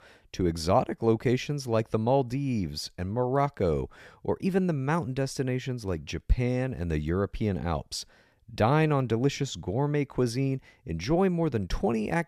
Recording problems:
none

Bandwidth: 14.5 kHz